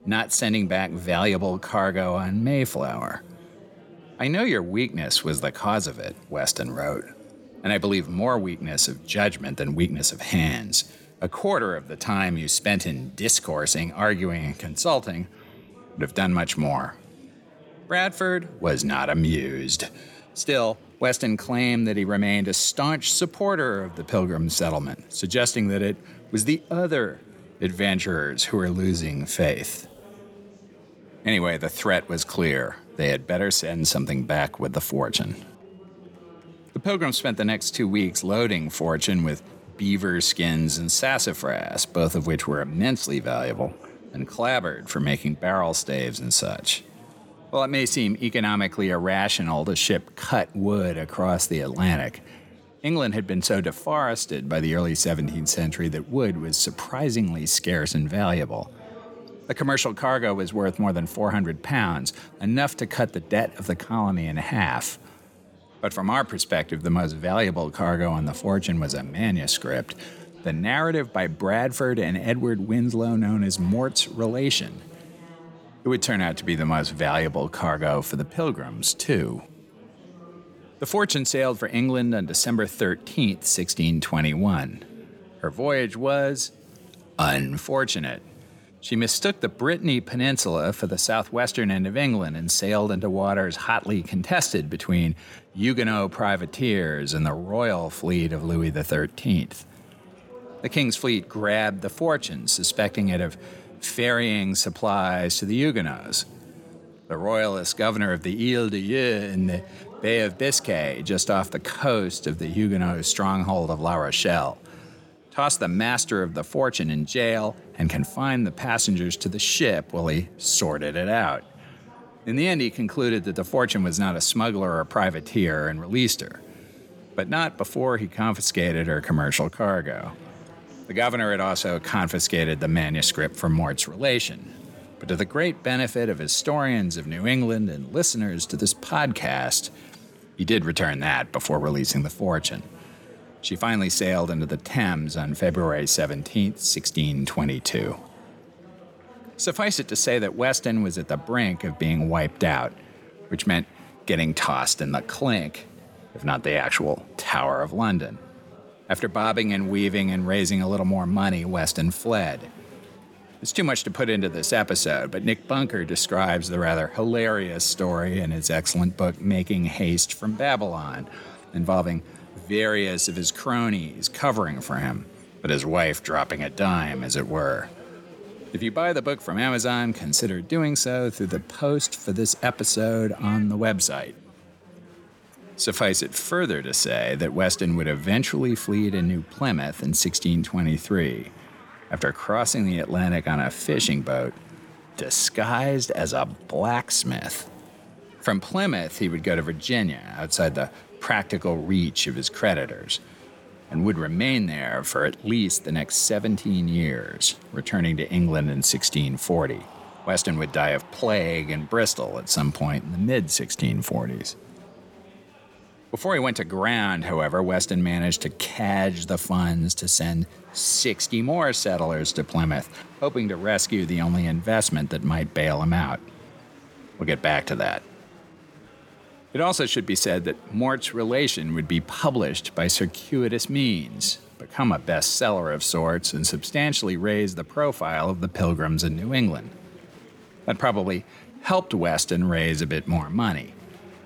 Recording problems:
chatter from many people; faint; throughout; 25 dB below the speech

